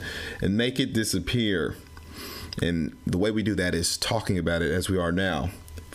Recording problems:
squashed, flat; somewhat

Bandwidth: 15 kHz